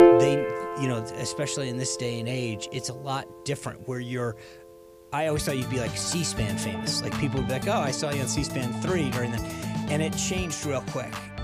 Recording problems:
background music; loud; throughout; 1 dB below the speech

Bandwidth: 15 kHz